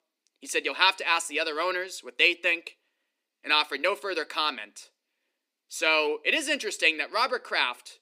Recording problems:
thin; somewhat; fading below 250 Hz

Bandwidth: 15.5 kHz